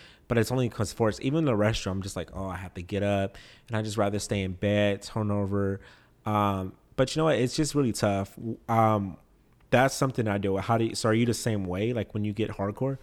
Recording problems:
none

